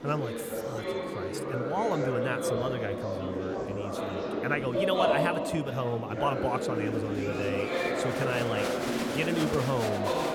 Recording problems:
murmuring crowd; very loud; throughout; 2 dB above the speech

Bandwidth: 18 kHz